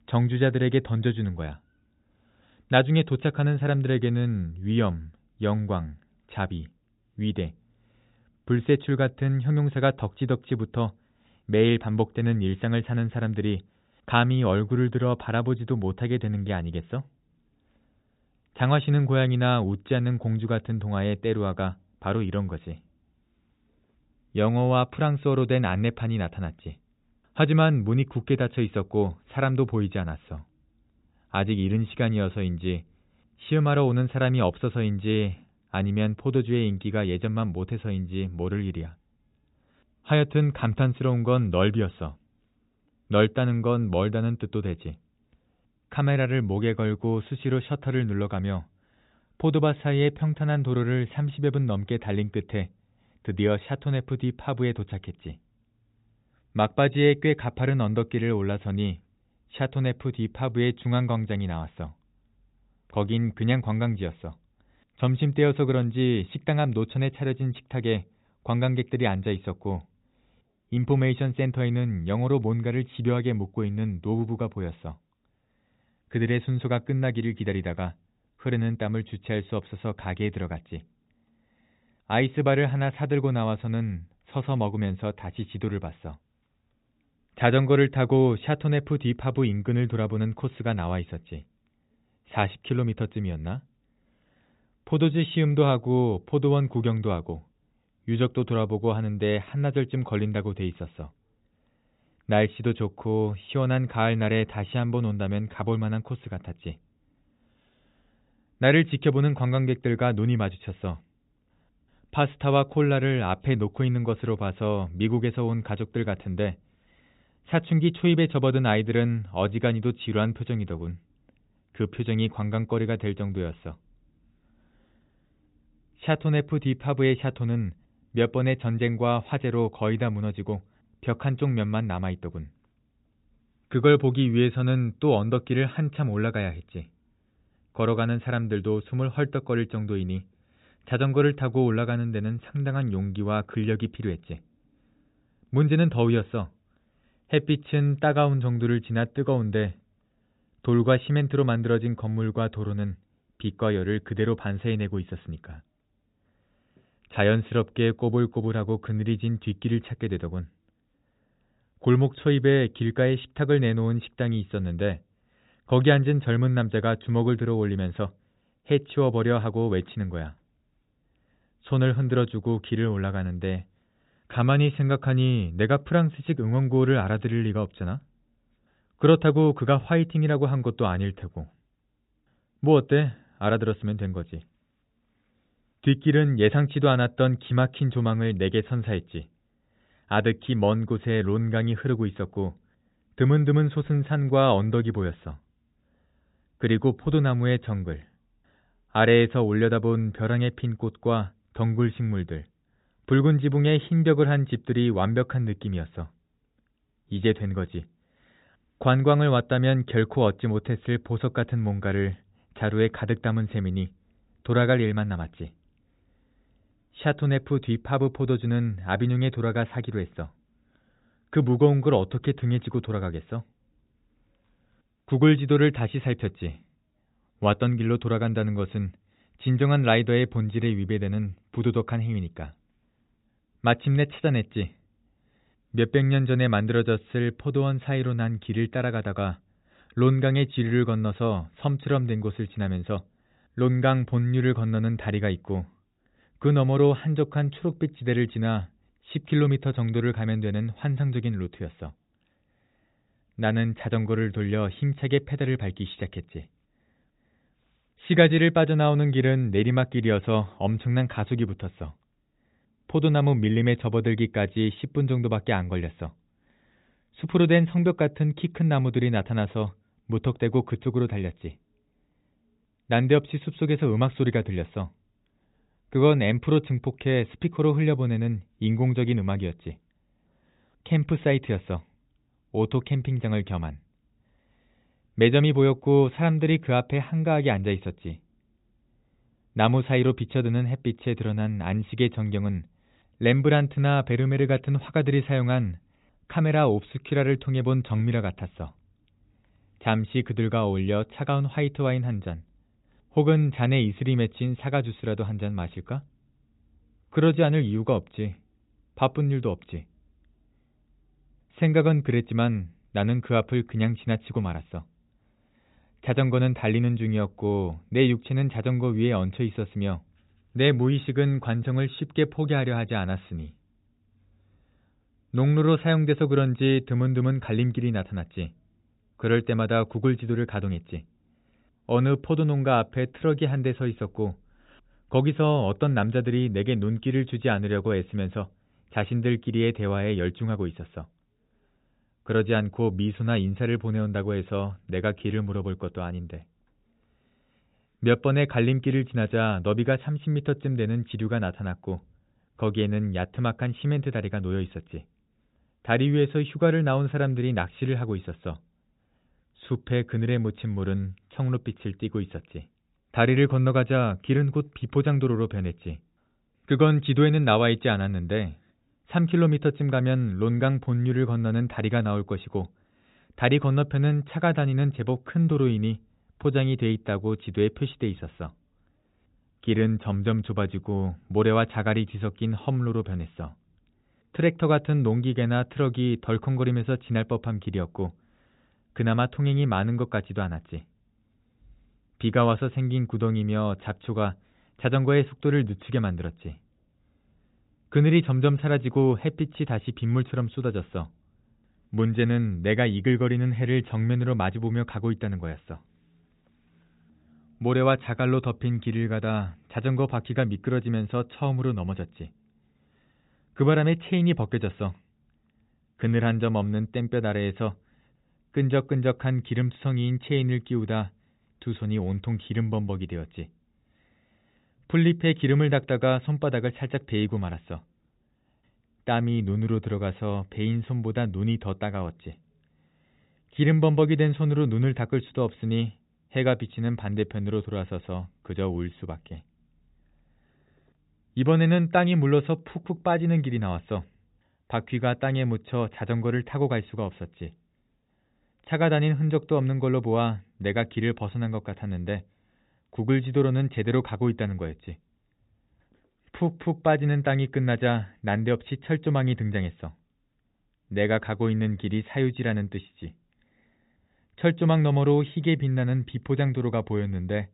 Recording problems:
high frequencies cut off; severe; nothing above 4 kHz

